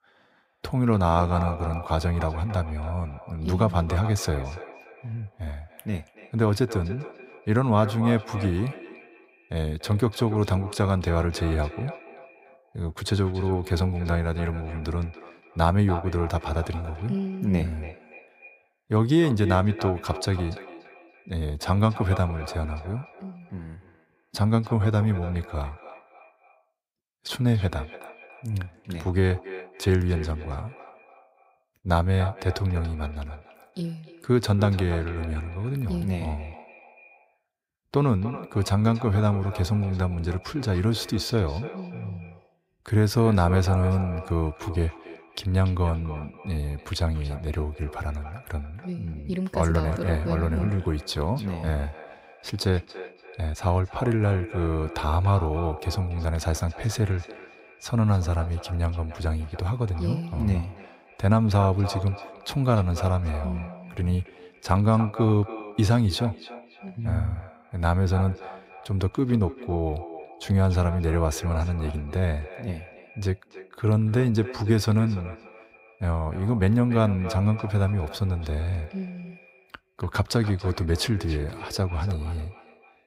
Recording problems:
echo of what is said; noticeable; throughout; 290 ms later, 15 dB below the speech

